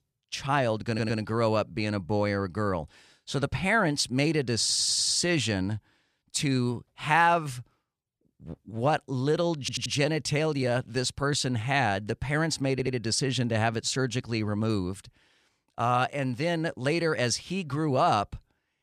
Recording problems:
audio stuttering; 4 times, first at 1 s

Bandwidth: 14.5 kHz